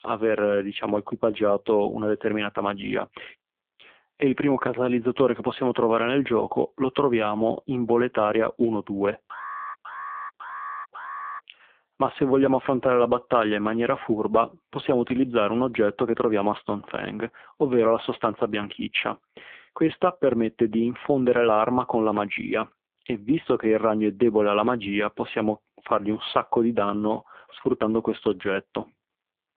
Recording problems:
phone-call audio; poor line
alarm; noticeable; from 9.5 to 11 s; peak 10 dB below the speech

